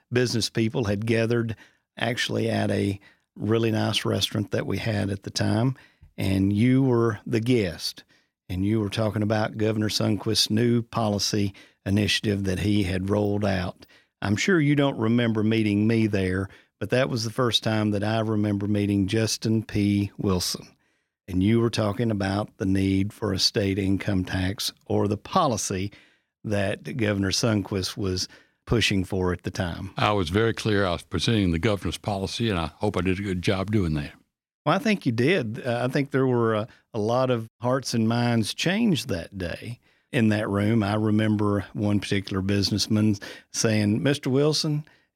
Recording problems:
none

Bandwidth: 16.5 kHz